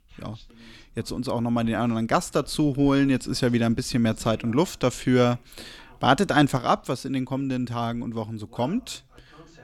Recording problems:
voice in the background; faint; throughout; 30 dB below the speech

